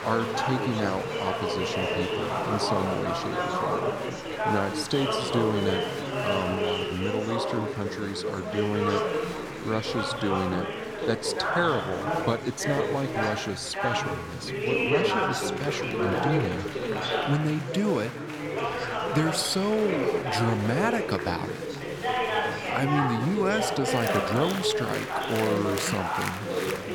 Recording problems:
chatter from many people; very loud; throughout; 1 dB above the speech

